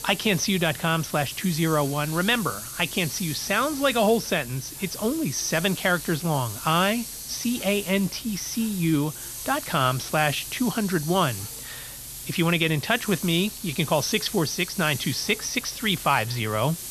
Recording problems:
high frequencies cut off; noticeable; nothing above 6.5 kHz
hiss; loud; throughout; 9 dB below the speech

